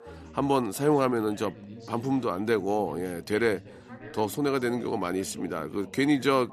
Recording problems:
background chatter; noticeable; throughout; 3 voices, 20 dB below the speech

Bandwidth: 13.5 kHz